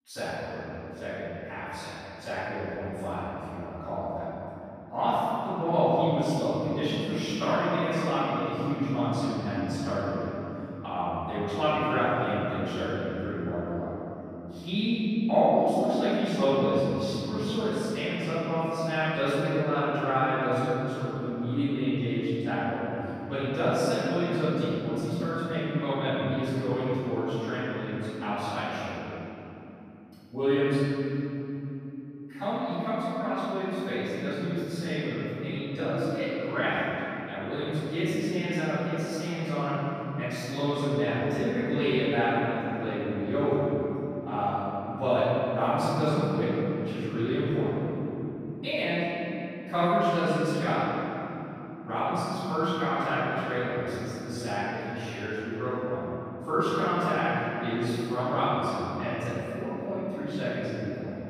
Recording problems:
room echo; strong; dies away in 3 s
off-mic speech; far

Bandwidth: 15 kHz